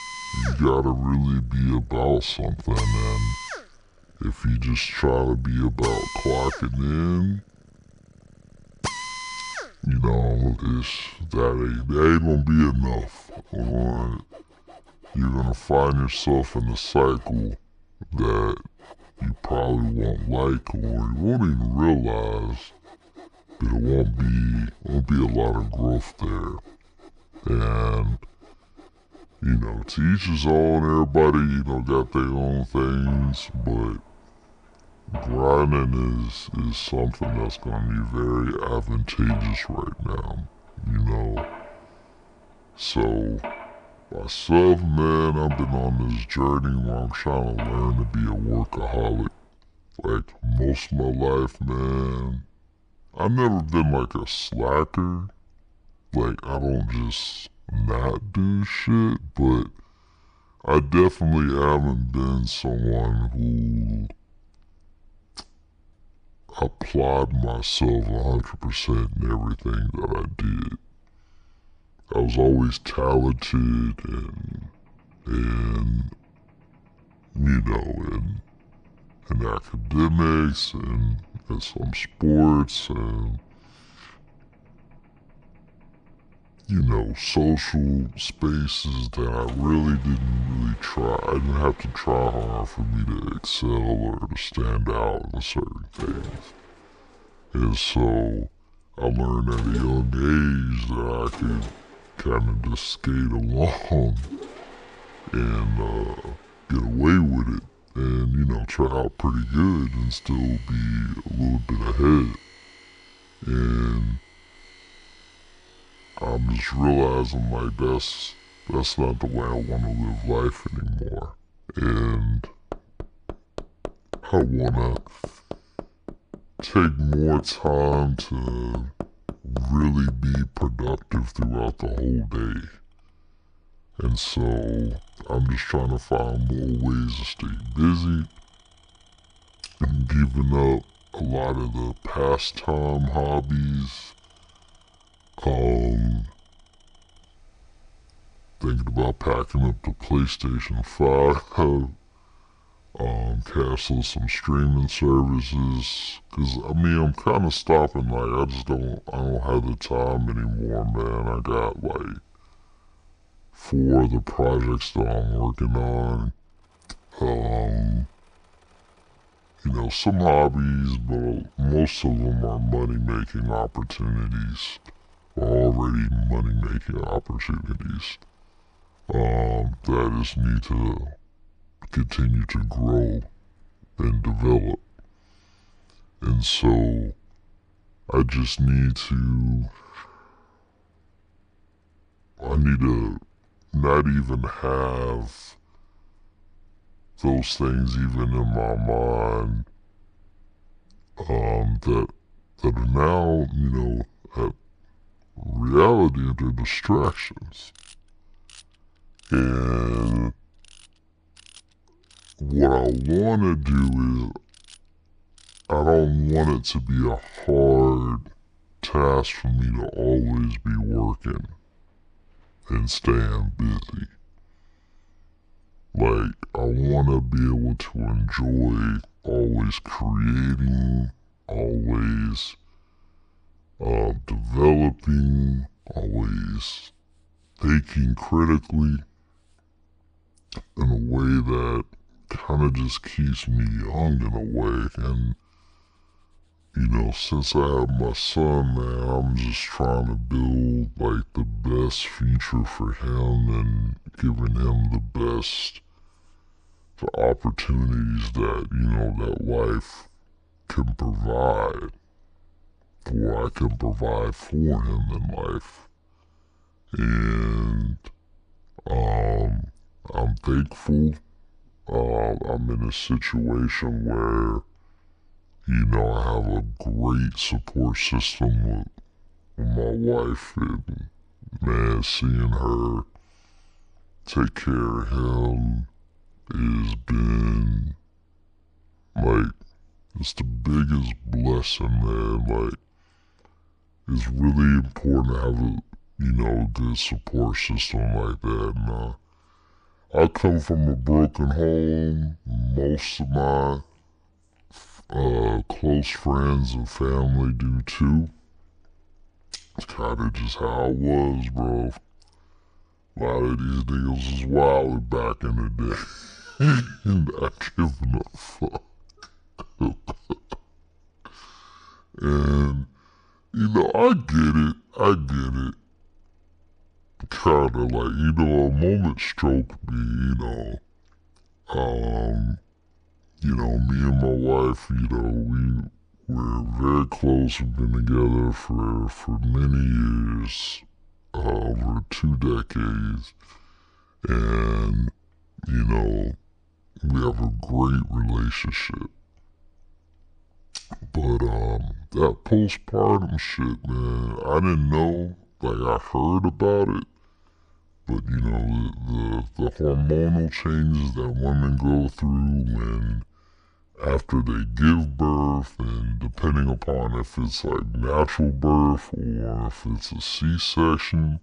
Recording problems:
wrong speed and pitch; too slow and too low; 0.7 times normal speed
machinery noise; noticeable; throughout; 20 dB below the speech

